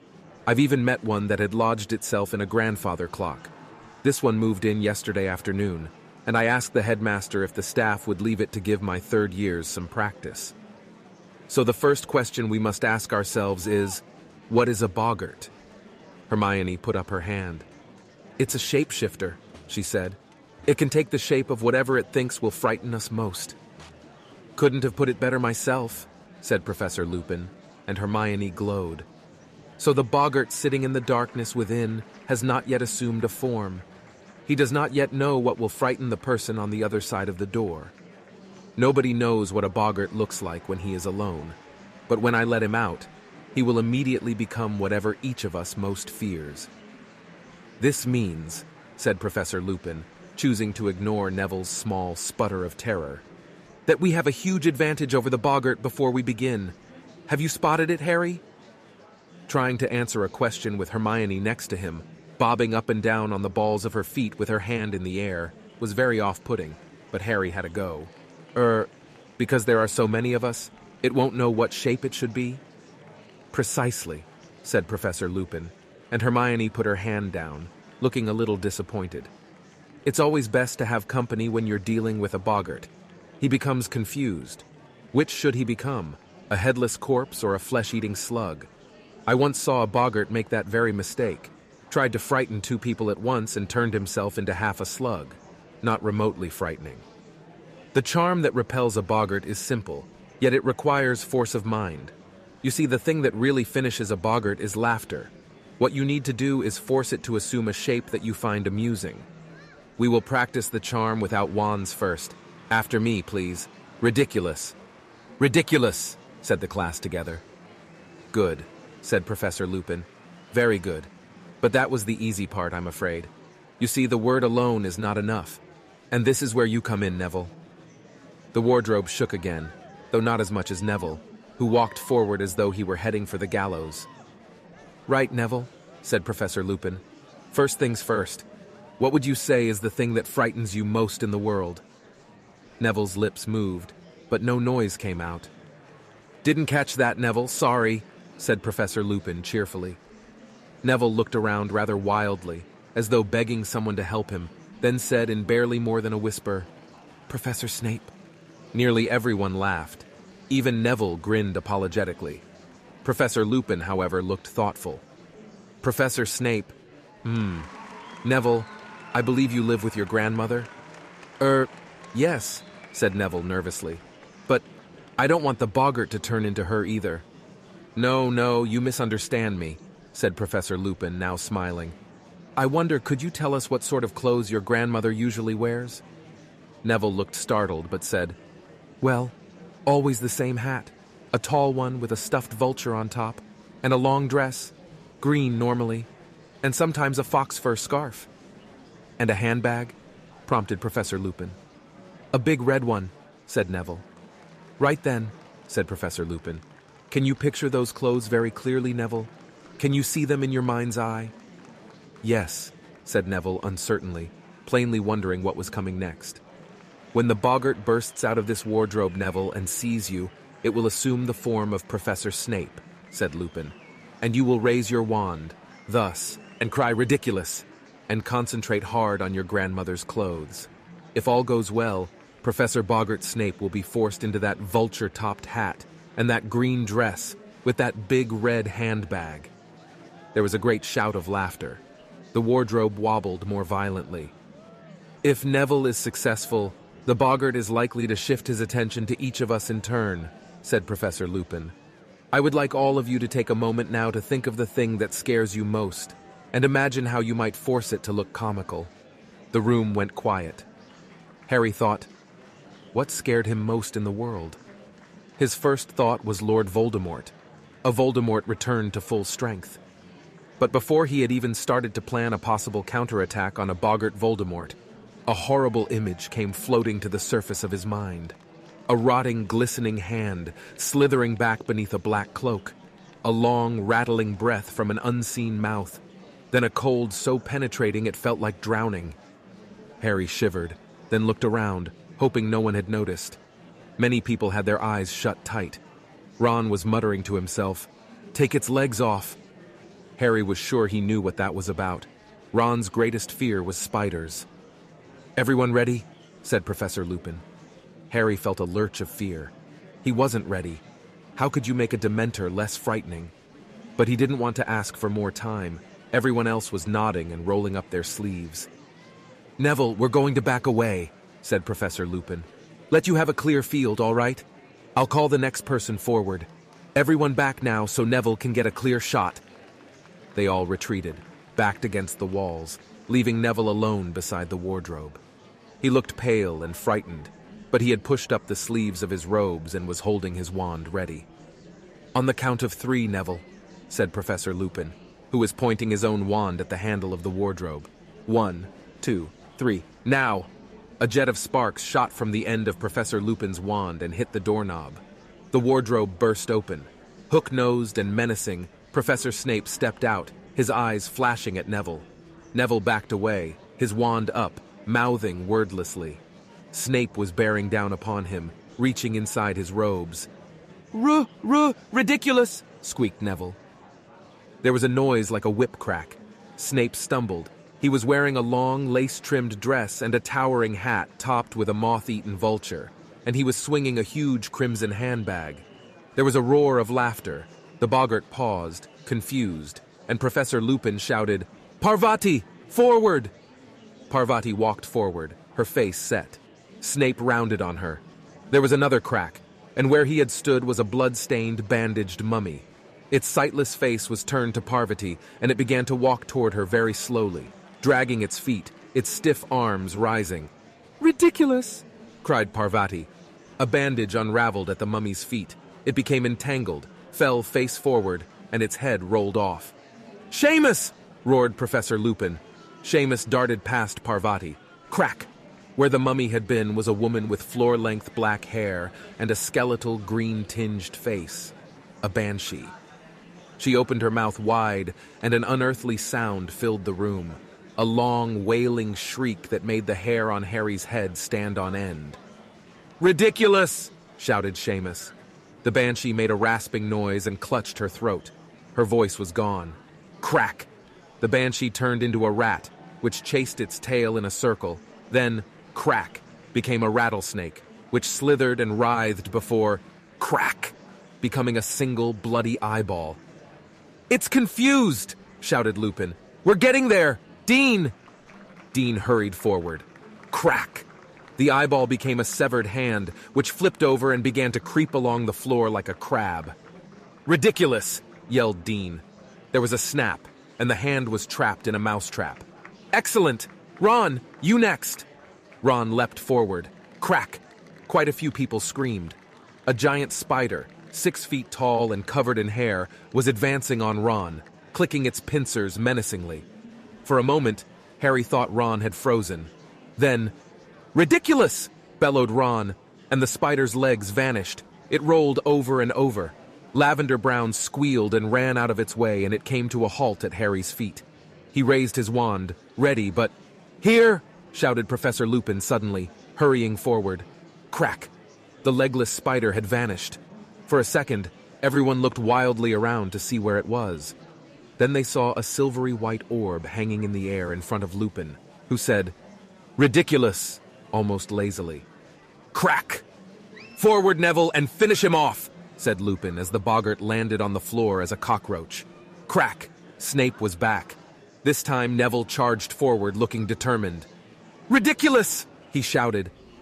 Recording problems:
murmuring crowd; faint; throughout; 25 dB below the speech

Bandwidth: 14.5 kHz